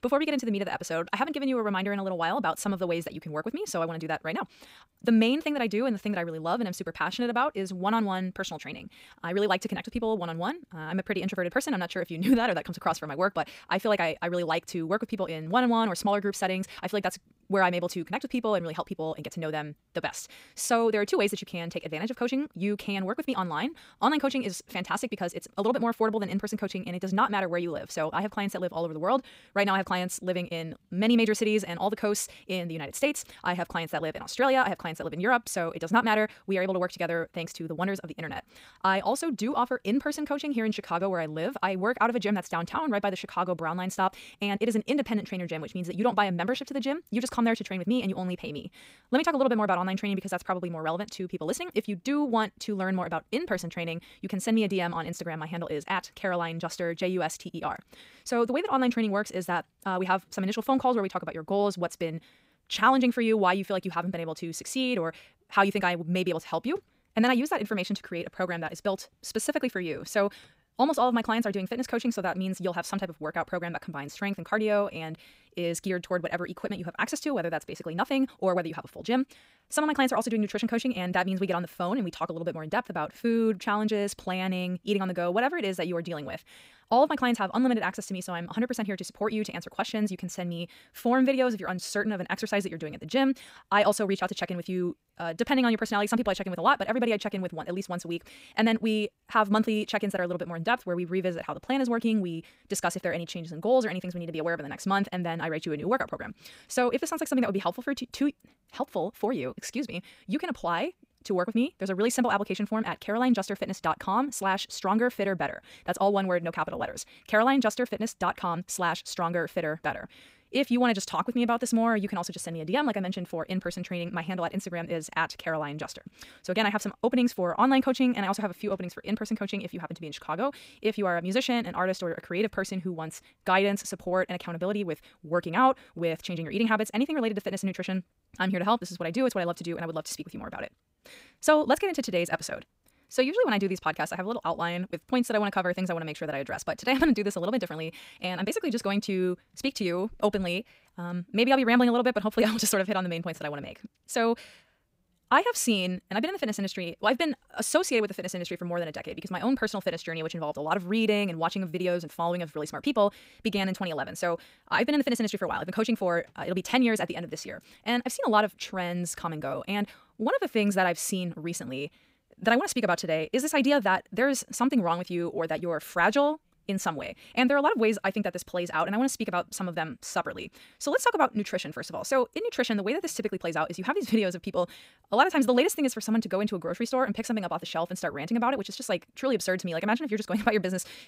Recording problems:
wrong speed, natural pitch; too fast; 1.6 times normal speed

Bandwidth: 15.5 kHz